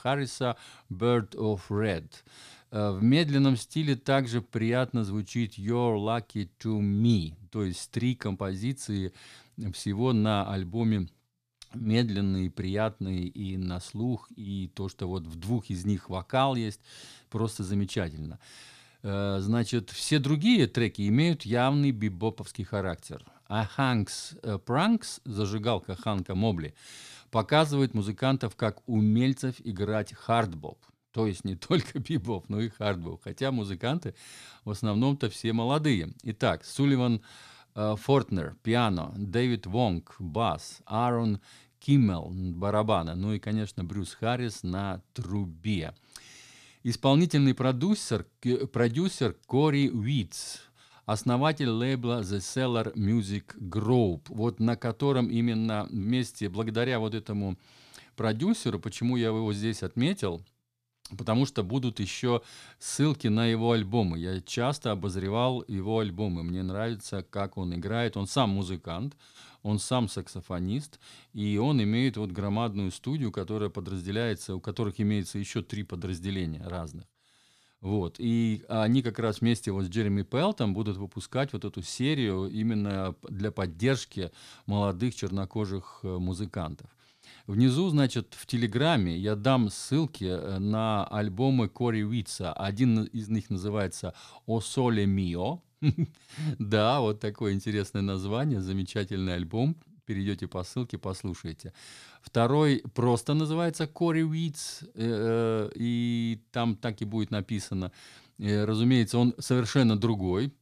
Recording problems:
none

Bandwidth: 14.5 kHz